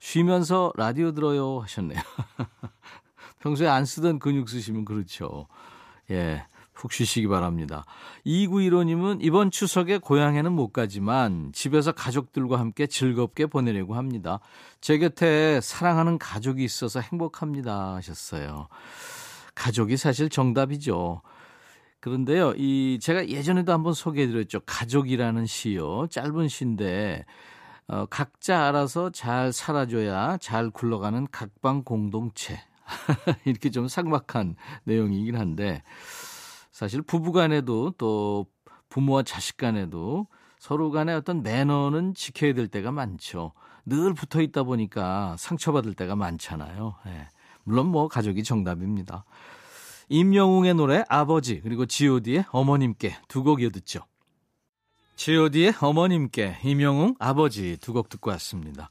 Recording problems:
none

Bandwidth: 14.5 kHz